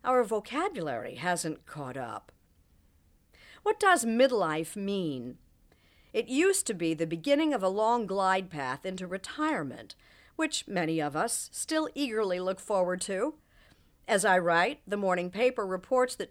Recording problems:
none

